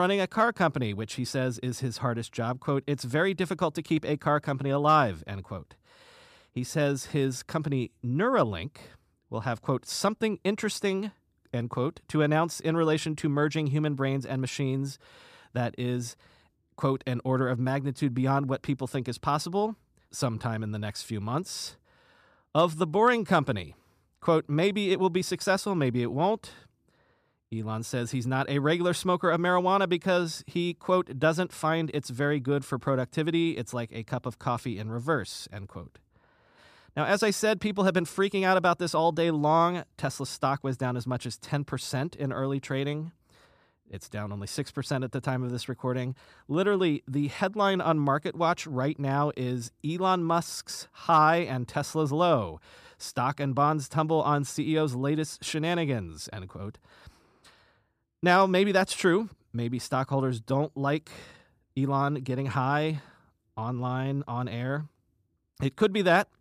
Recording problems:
abrupt cut into speech; at the start

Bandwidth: 14.5 kHz